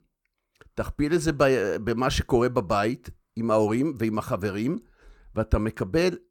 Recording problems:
none

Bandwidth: 18 kHz